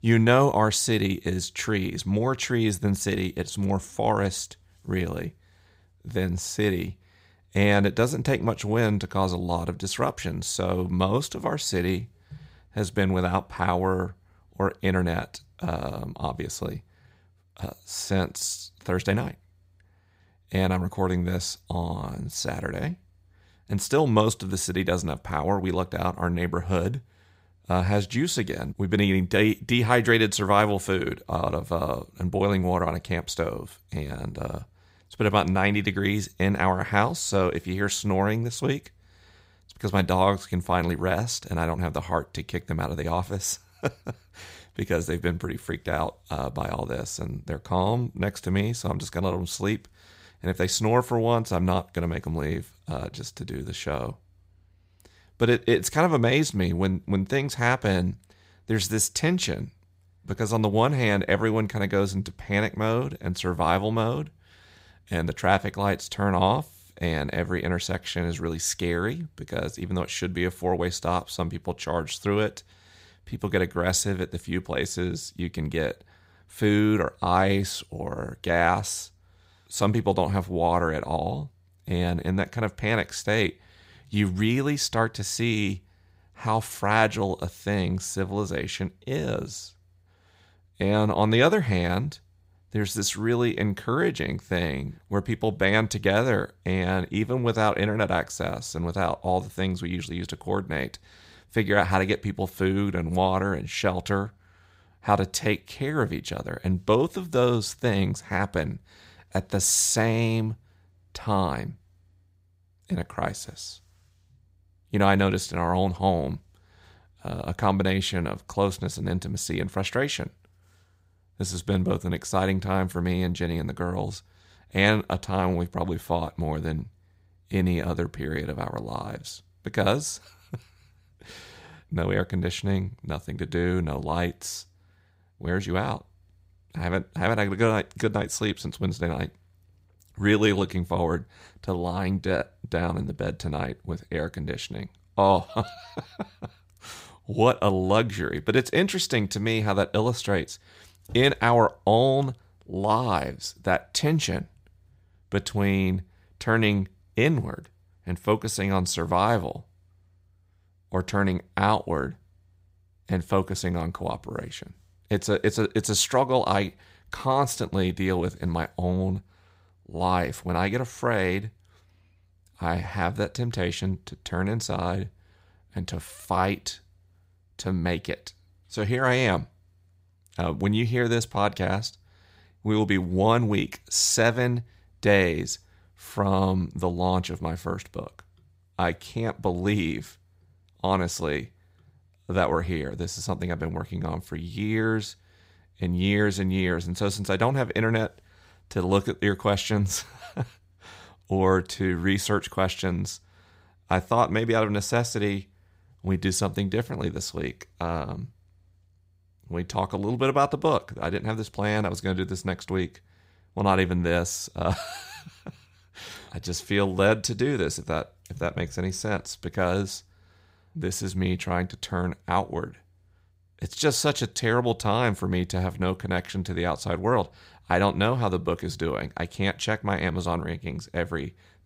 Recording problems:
none

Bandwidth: 15.5 kHz